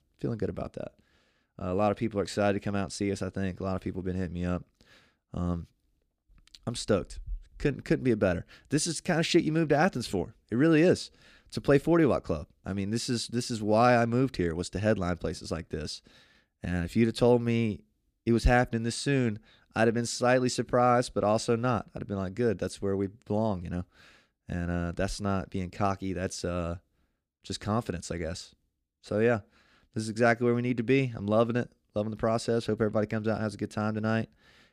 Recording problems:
none

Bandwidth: 15 kHz